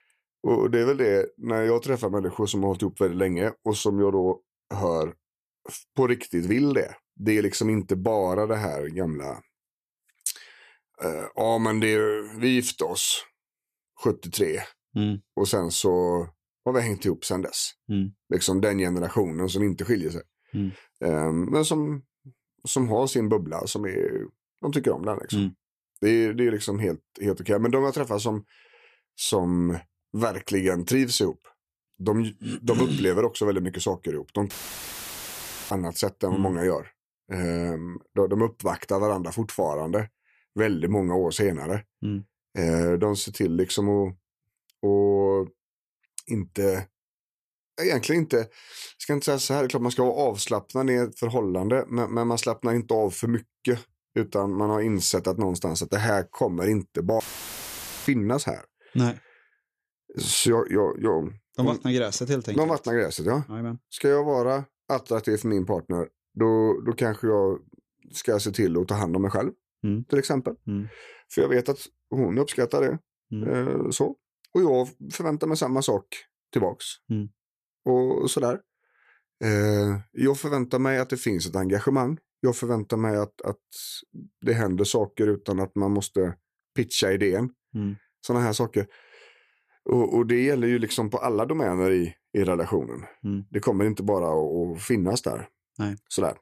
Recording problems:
audio cutting out; filled with static; at 35 s for 1 s and at 57 s for 1 s

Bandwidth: 14.5 kHz